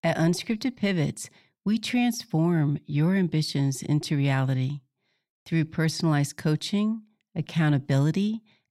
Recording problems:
none

